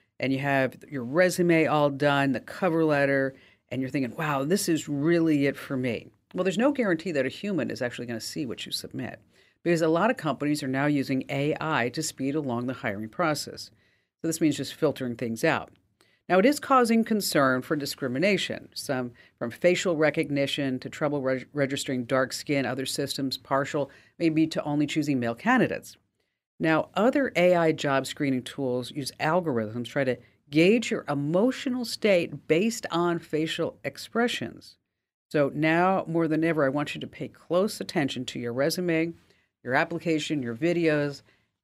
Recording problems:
none

